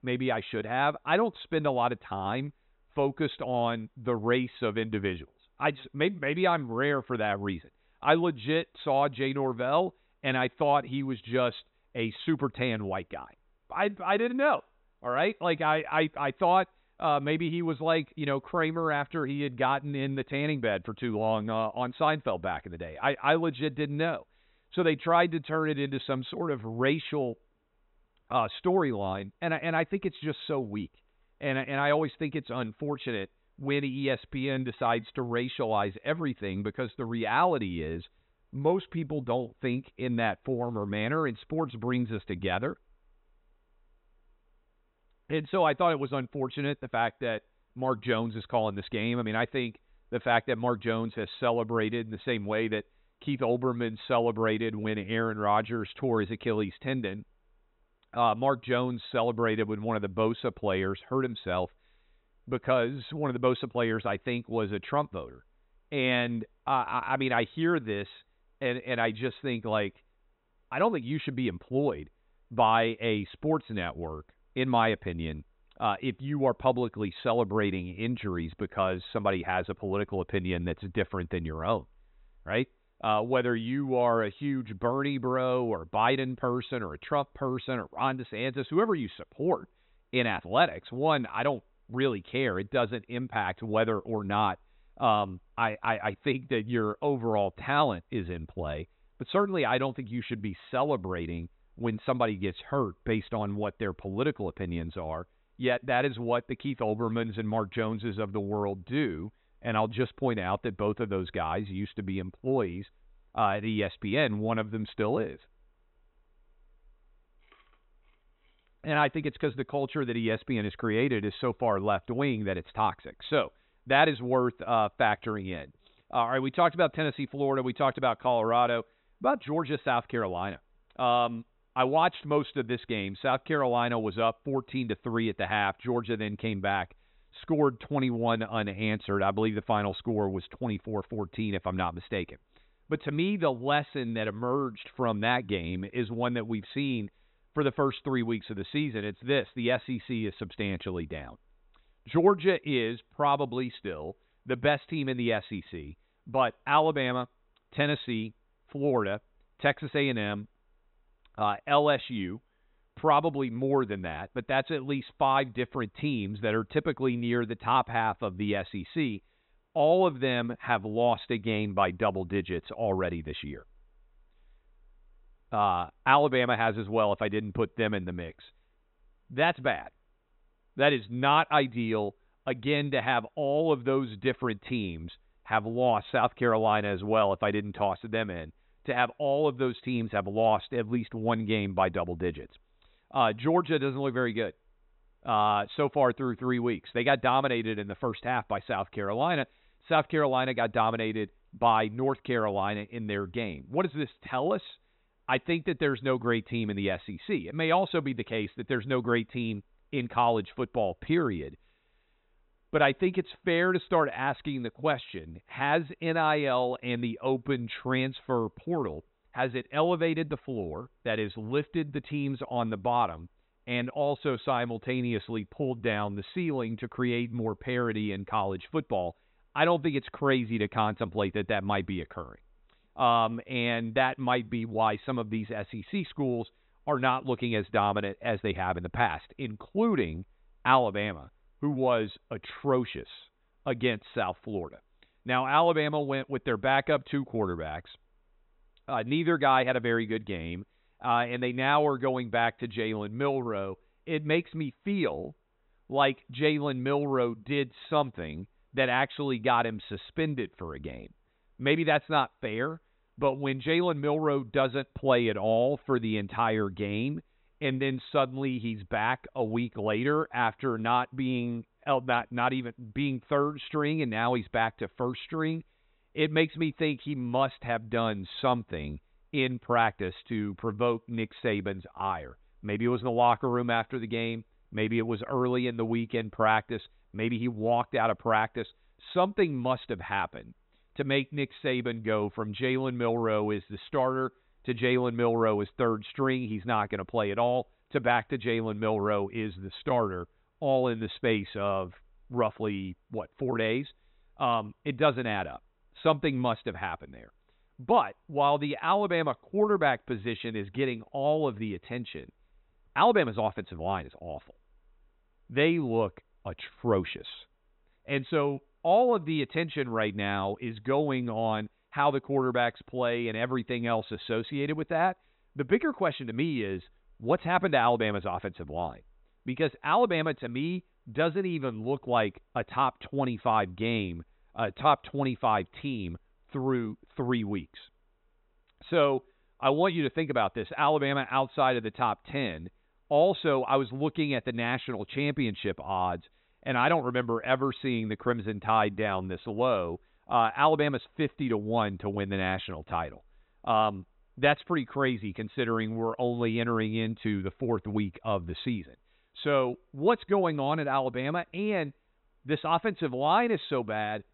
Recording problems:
high frequencies cut off; severe; nothing above 4 kHz

